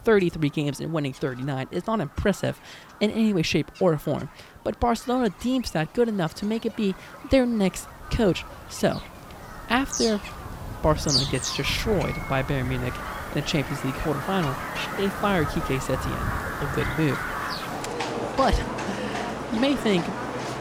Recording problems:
animal sounds; loud; throughout; 5 dB below the speech

